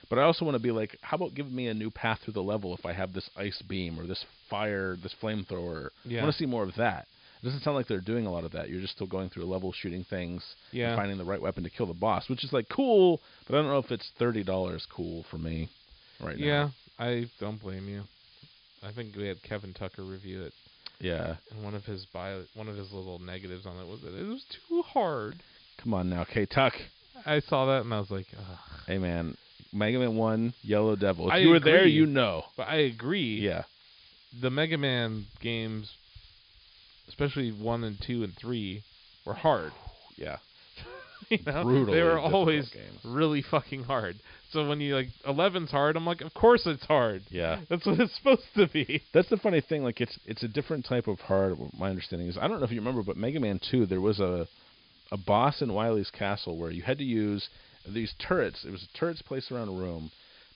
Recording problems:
high frequencies cut off; noticeable; nothing above 5 kHz
hiss; faint; throughout; 25 dB below the speech

